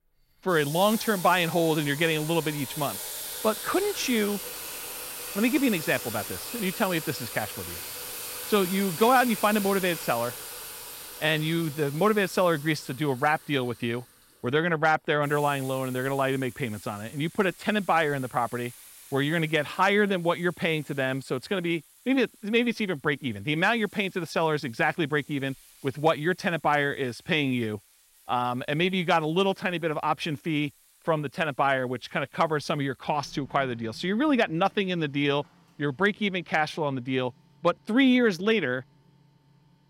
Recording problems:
household noises; noticeable; throughout; 10 dB below the speech

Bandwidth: 16 kHz